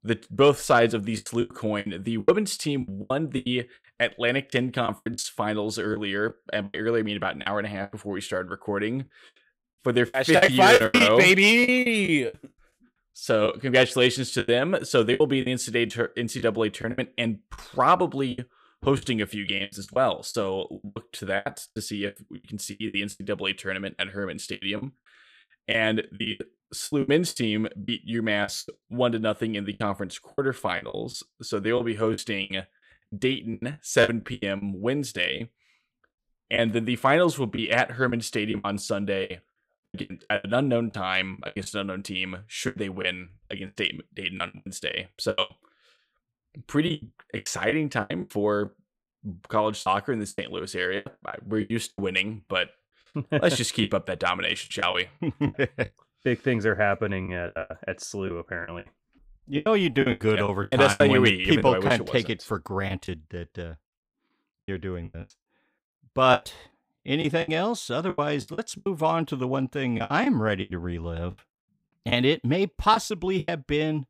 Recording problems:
choppy; very; 13% of the speech affected

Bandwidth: 15.5 kHz